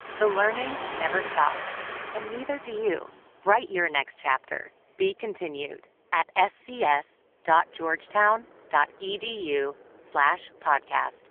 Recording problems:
phone-call audio; poor line; nothing above 3.5 kHz
traffic noise; loud; throughout; 8 dB below the speech

